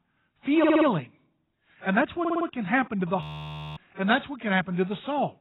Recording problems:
garbled, watery; badly; nothing above 4 kHz
audio stuttering; at 0.5 s and at 2 s
audio freezing; at 3 s for 0.5 s

